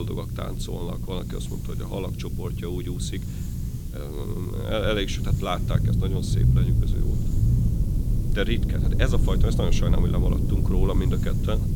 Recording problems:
low rumble; loud; throughout; 6 dB below the speech
hiss; noticeable; throughout; 15 dB below the speech
abrupt cut into speech; at the start

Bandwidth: 17 kHz